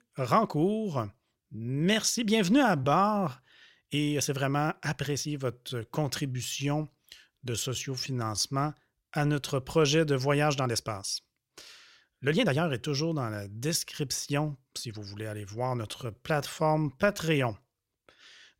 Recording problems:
uneven, jittery; strongly; from 1.5 to 17 s

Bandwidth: 16 kHz